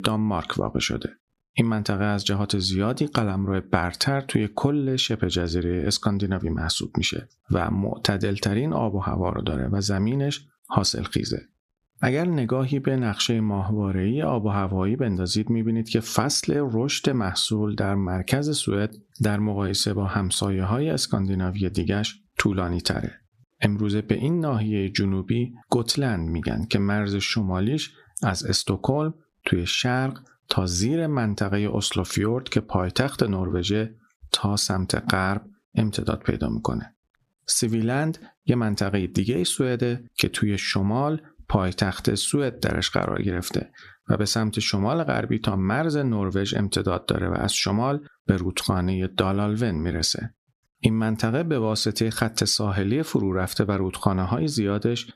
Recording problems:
squashed, flat; somewhat

